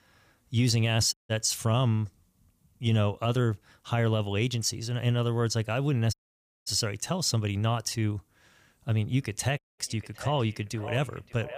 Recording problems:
echo of what is said; noticeable; from 9 s on; 570 ms later, 15 dB below the speech
audio cutting out; at 1 s, at 6 s for 0.5 s and at 9.5 s

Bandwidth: 15 kHz